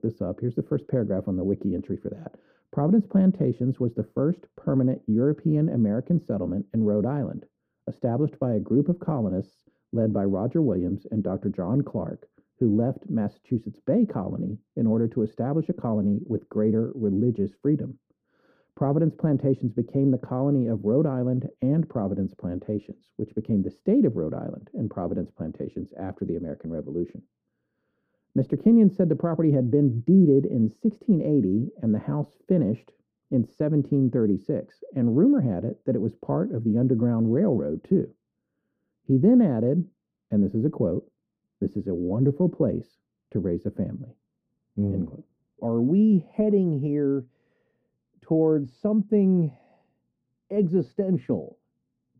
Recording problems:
muffled; very; fading above 1 kHz

